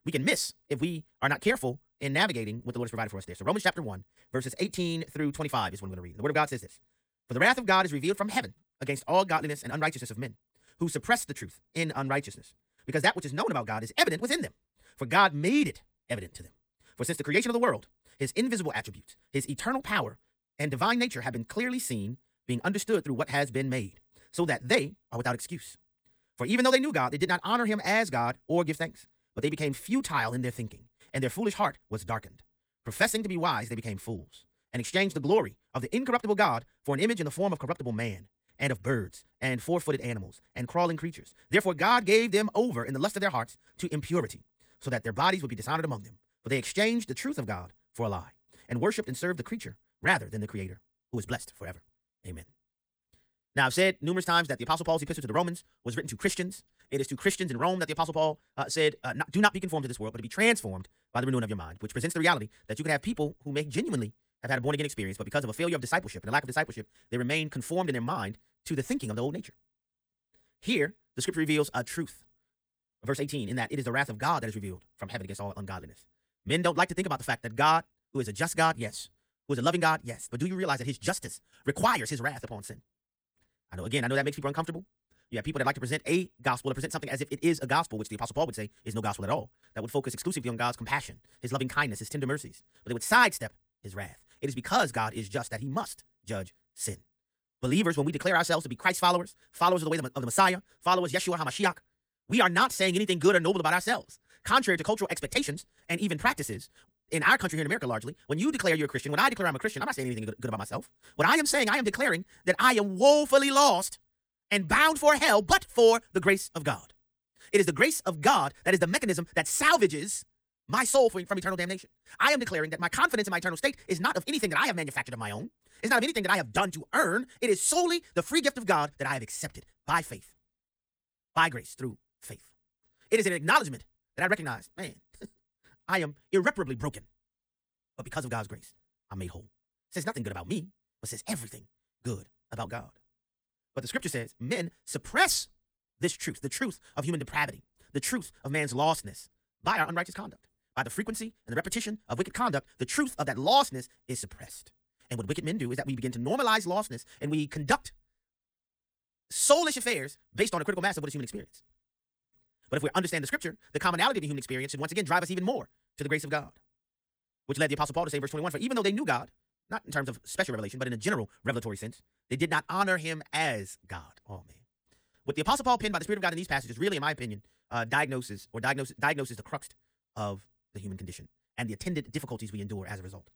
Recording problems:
wrong speed, natural pitch; too fast; 1.7 times normal speed

